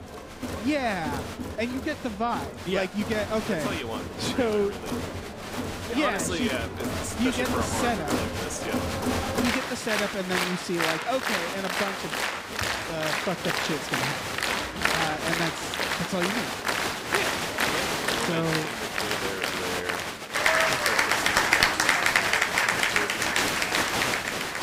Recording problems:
crowd noise; very loud; throughout; 4 dB above the speech

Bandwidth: 15.5 kHz